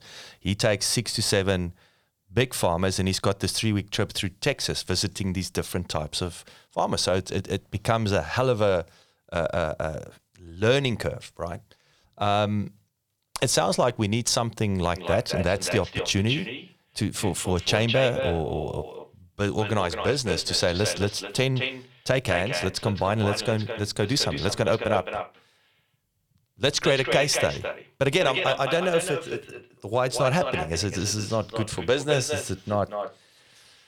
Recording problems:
echo of what is said; strong; from 15 s on; 210 ms later, 7 dB below the speech

